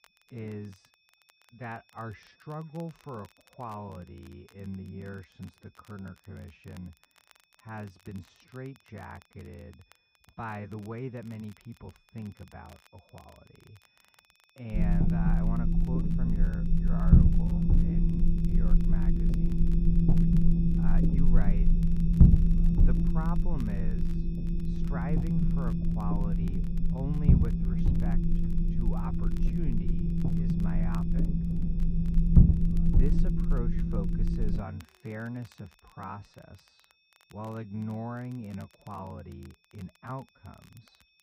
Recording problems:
muffled; very; fading above 1.5 kHz
wrong speed, natural pitch; too slow; 0.7 times normal speed
low rumble; very loud; from 15 to 35 s; 5 dB above the speech
high-pitched whine; faint; throughout; 2.5 kHz, 25 dB below the speech
crackle, like an old record; faint; 20 dB below the speech

